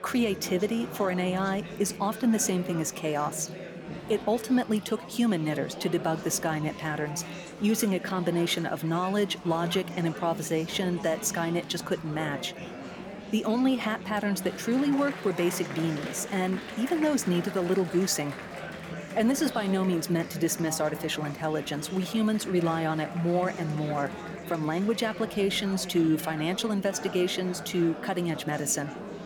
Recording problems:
chatter from many people; noticeable; throughout; 10 dB below the speech

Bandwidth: 18.5 kHz